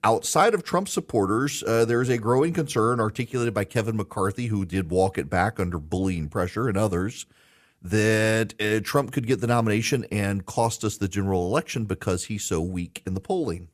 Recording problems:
none

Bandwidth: 14.5 kHz